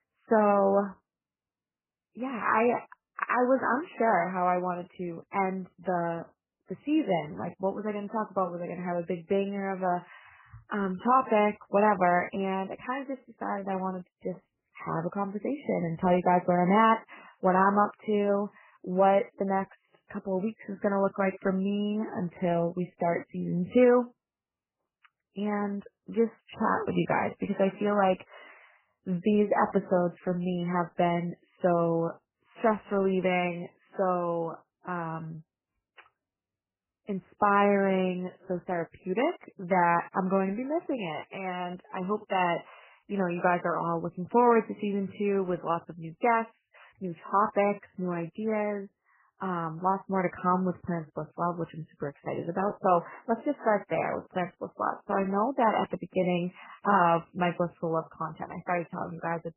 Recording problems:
garbled, watery; badly; nothing above 3 kHz

